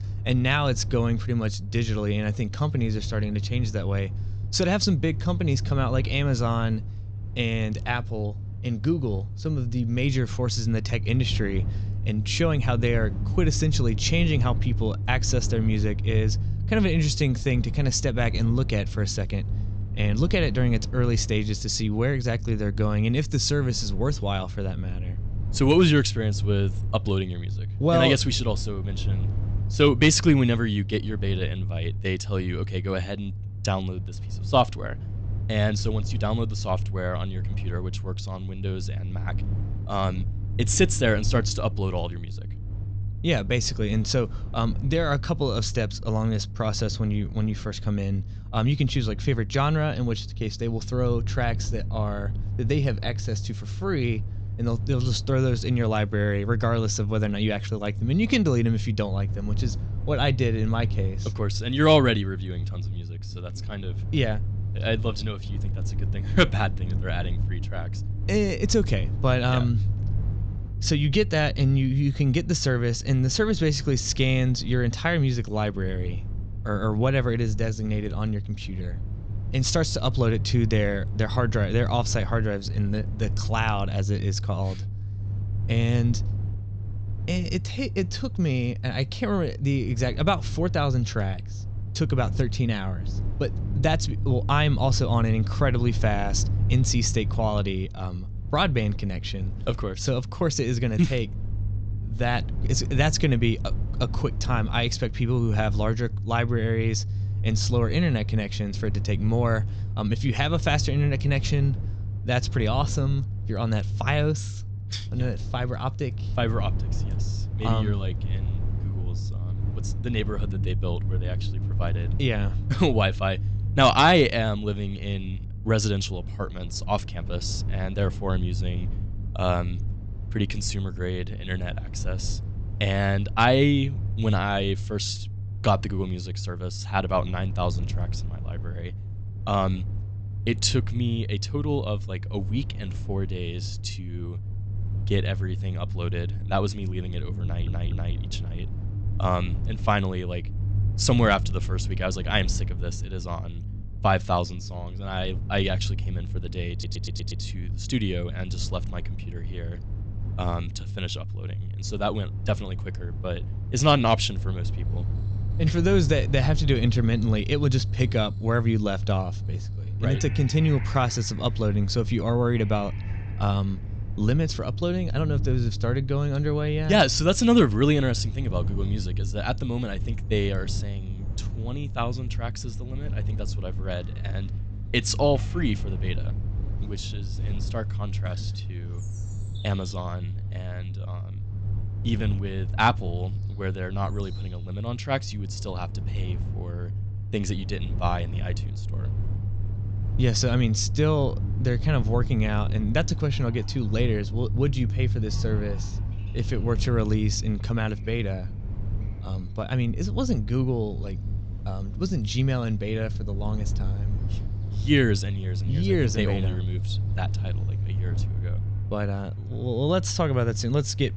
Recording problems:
high frequencies cut off; noticeable; nothing above 8 kHz
low rumble; noticeable; throughout; 15 dB below the speech
animal sounds; faint; from 2:45 on; 30 dB below the speech
audio stuttering; at 2:27 and at 2:37

